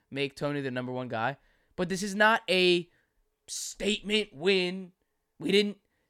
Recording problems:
none

